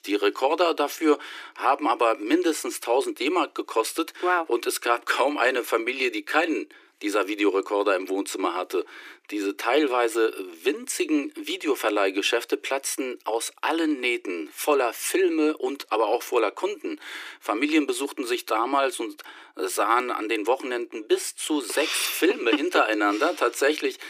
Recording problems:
thin; very; fading below 300 Hz

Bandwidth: 15 kHz